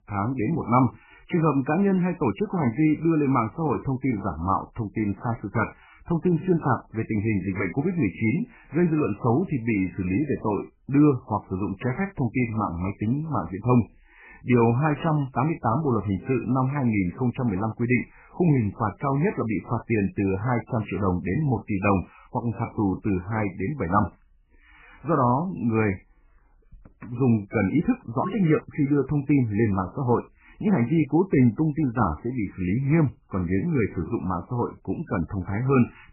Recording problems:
garbled, watery; badly; nothing above 2.5 kHz

